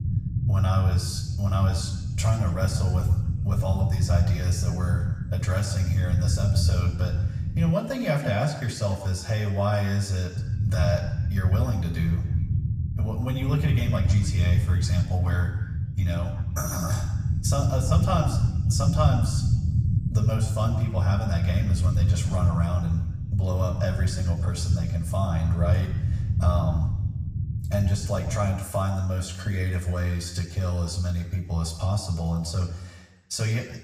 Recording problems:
room echo; slight; dies away in 1 s
off-mic speech; somewhat distant
low rumble; loud; until 7.5 s and from 10 to 29 s; 8 dB below the speech

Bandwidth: 14.5 kHz